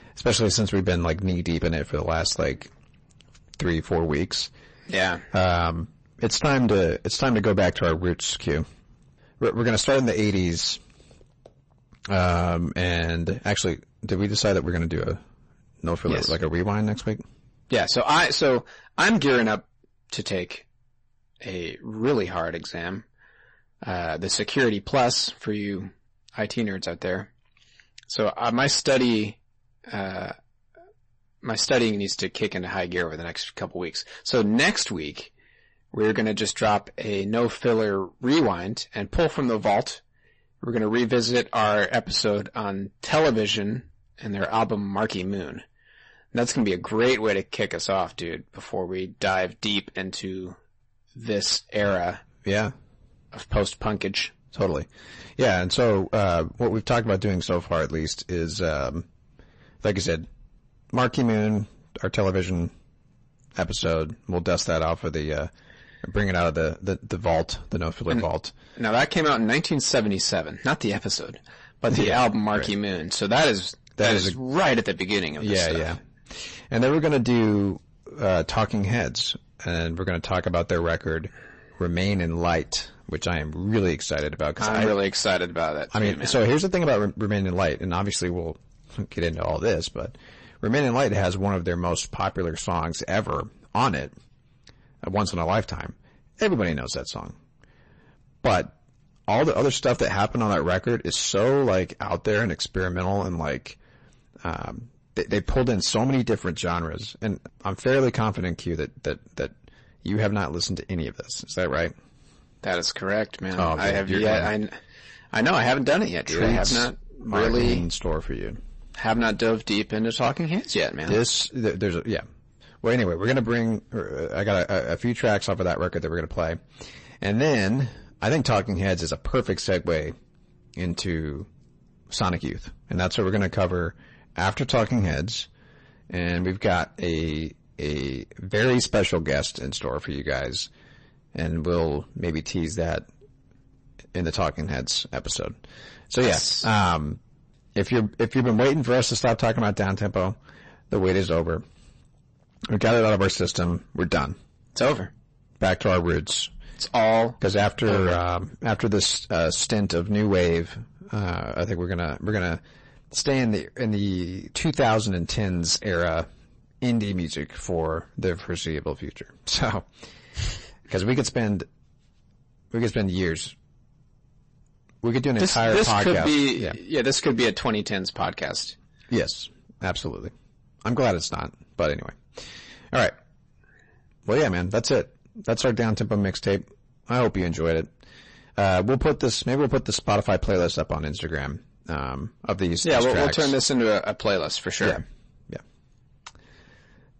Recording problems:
distortion; heavy; 7% of the sound clipped
garbled, watery; slightly; nothing above 8 kHz

